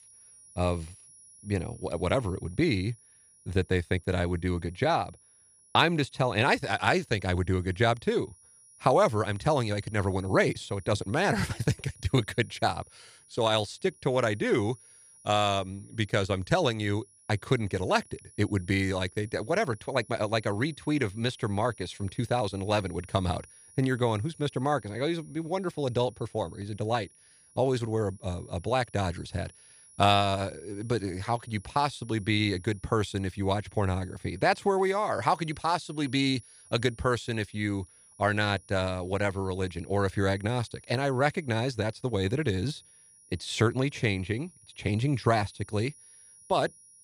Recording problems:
high-pitched whine; faint; throughout; 10.5 kHz, 25 dB below the speech

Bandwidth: 14.5 kHz